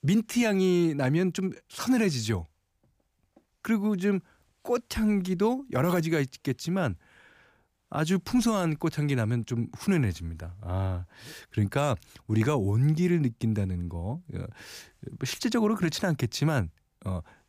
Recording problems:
none

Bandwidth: 15 kHz